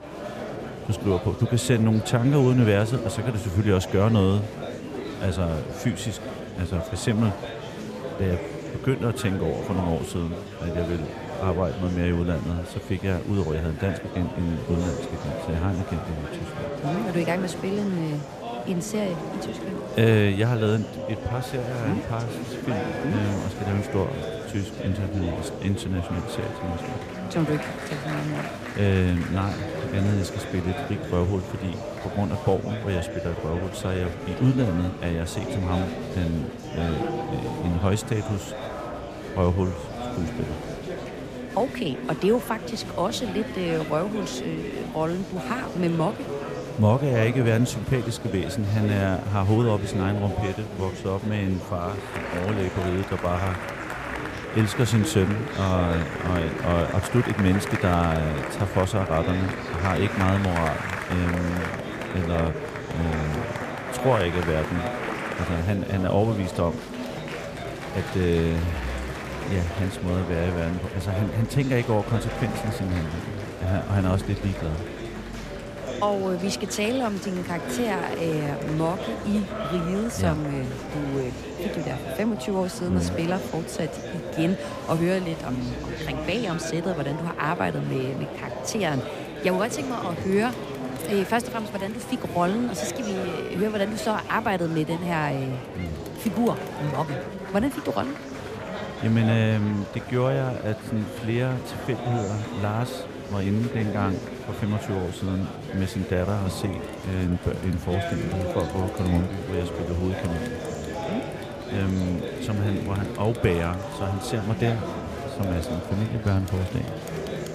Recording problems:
murmuring crowd; loud; throughout; 6 dB below the speech

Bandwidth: 14.5 kHz